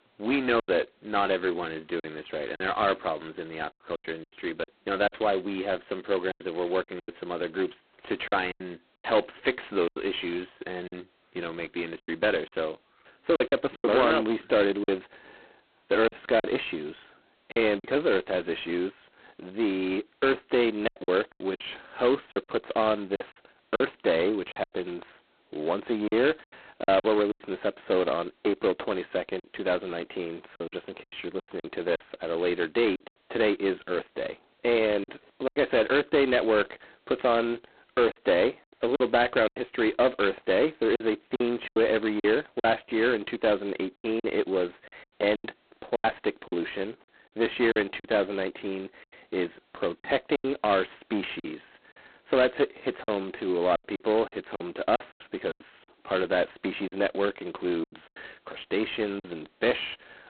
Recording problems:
phone-call audio; poor line; nothing above 4 kHz
distortion; slight; 15 dB below the speech
choppy; very; 9% of the speech affected

